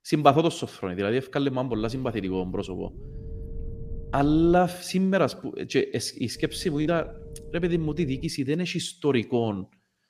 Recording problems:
low rumble; faint; from 1.5 to 4.5 s and from 6.5 to 8.5 s; 20 dB below the speech

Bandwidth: 15 kHz